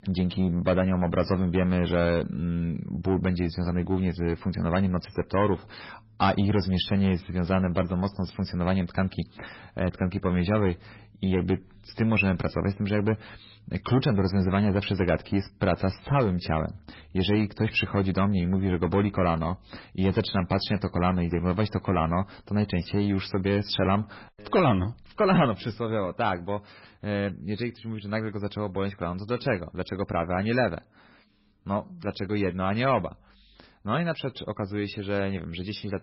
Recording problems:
garbled, watery; badly; nothing above 5.5 kHz
distortion; slight; 10 dB below the speech

